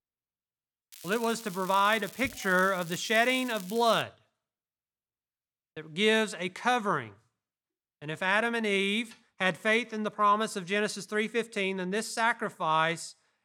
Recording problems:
crackling; noticeable; from 1 to 4 s; 15 dB below the speech

